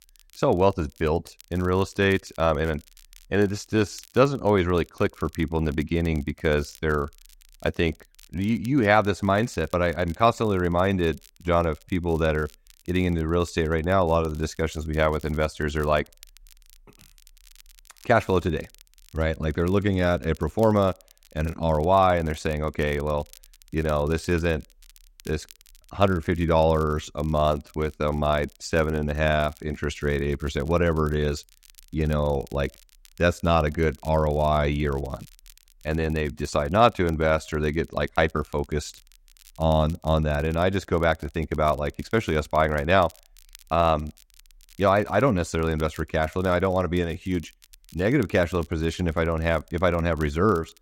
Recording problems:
crackle, like an old record; faint; 30 dB below the speech

